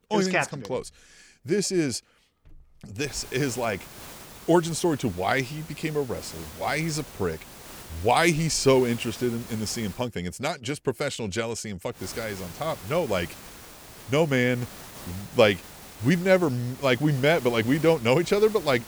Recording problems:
hiss; noticeable; from 3 to 10 s and from 12 s on; 15 dB below the speech

